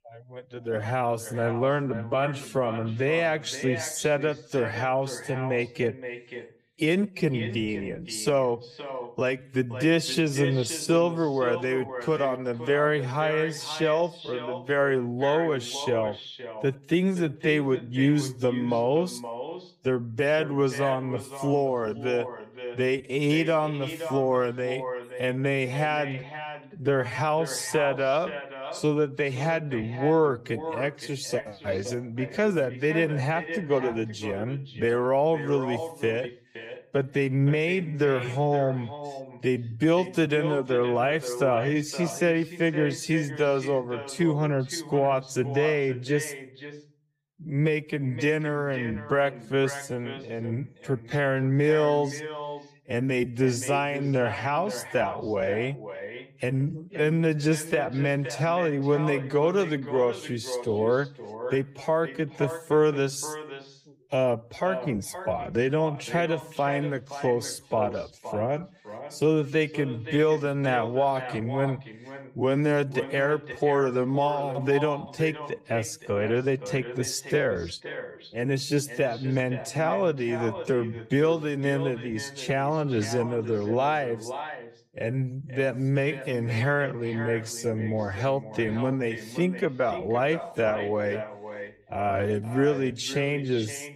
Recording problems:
echo of what is said; strong; throughout; 520 ms later, 10 dB below the speech
wrong speed, natural pitch; too slow; 0.6 times normal speed

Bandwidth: 15.5 kHz